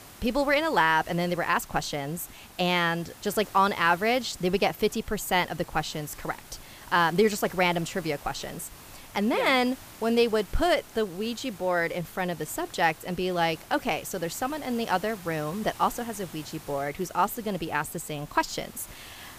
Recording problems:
hiss; noticeable; throughout; 20 dB below the speech

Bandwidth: 15 kHz